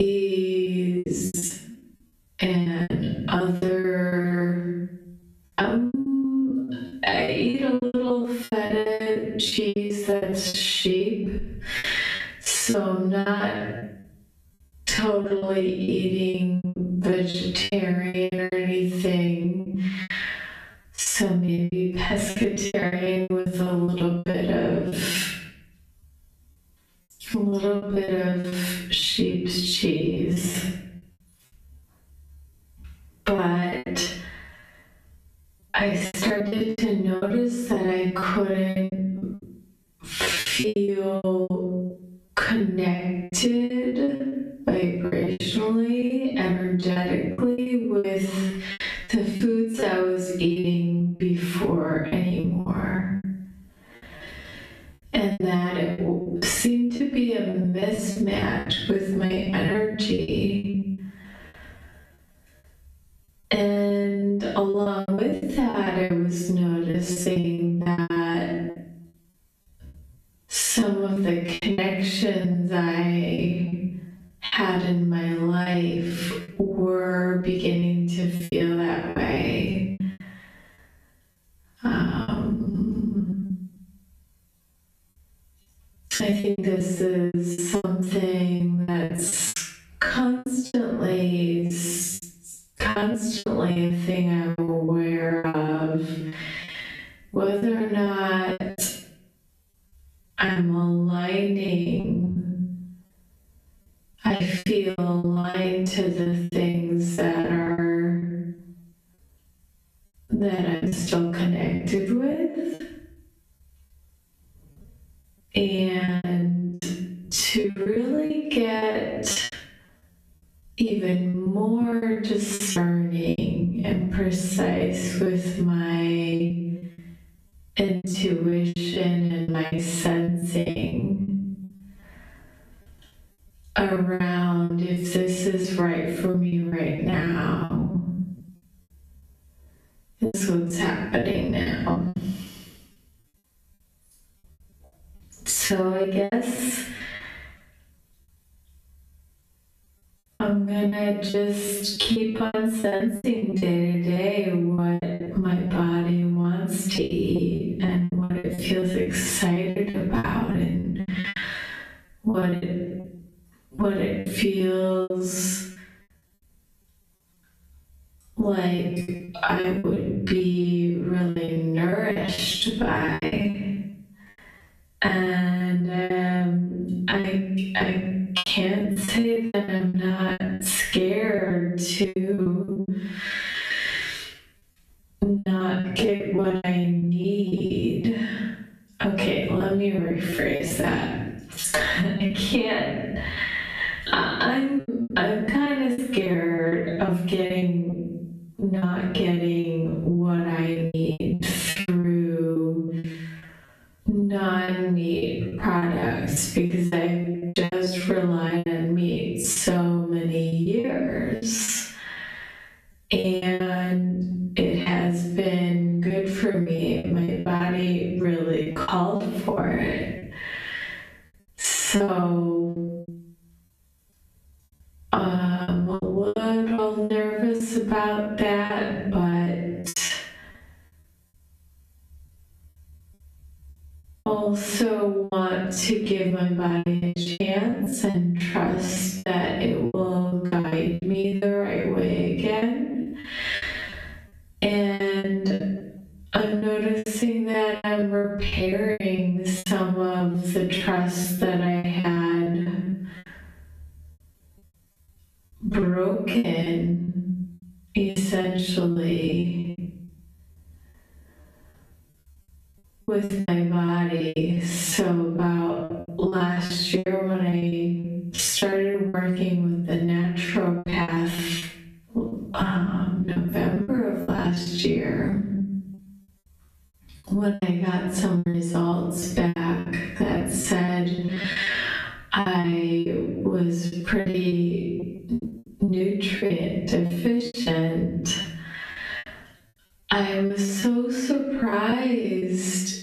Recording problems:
off-mic speech; far
squashed, flat; heavily
wrong speed, natural pitch; too slow; 0.5 times normal speed
room echo; noticeable; dies away in 0.6 s
choppy; very; 15% of the speech affected
abrupt cut into speech; at the start

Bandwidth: 14.5 kHz